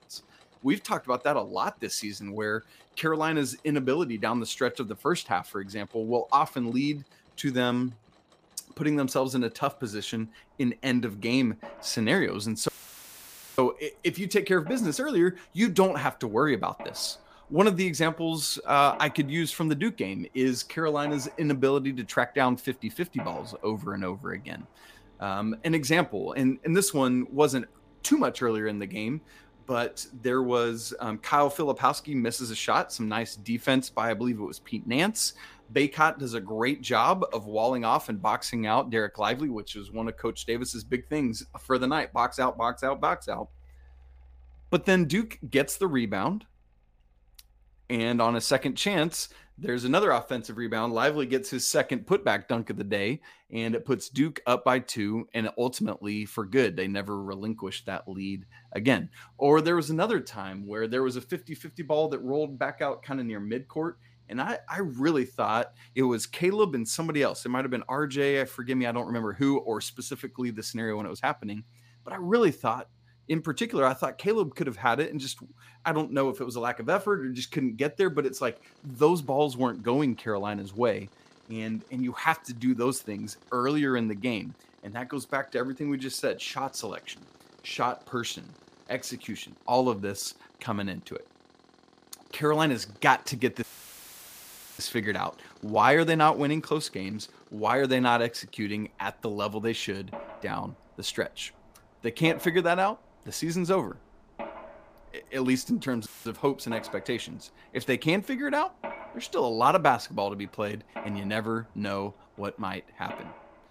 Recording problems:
machinery noise; faint; throughout; 25 dB below the speech
audio cutting out; filled with static; at 13 s for 1 s, at 1:34 for 1 s and at 1:46

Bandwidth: 15 kHz